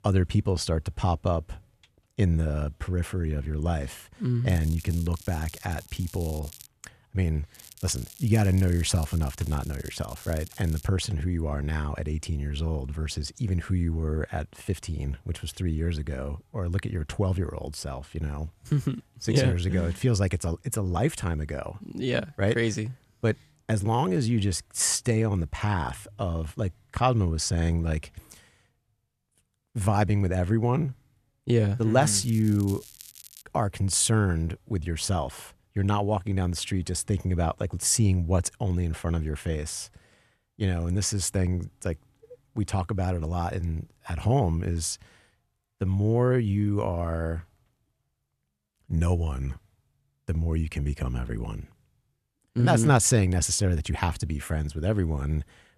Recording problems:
crackling; noticeable; from 4.5 to 6.5 s, from 7.5 to 11 s and from 32 to 33 s; 20 dB below the speech

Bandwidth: 14 kHz